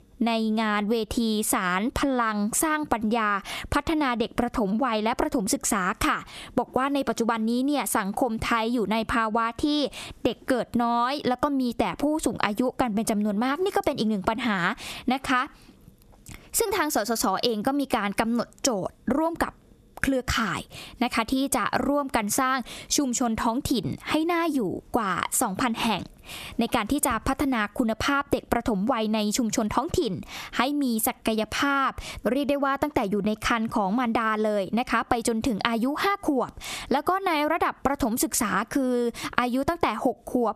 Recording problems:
squashed, flat; somewhat

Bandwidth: 14 kHz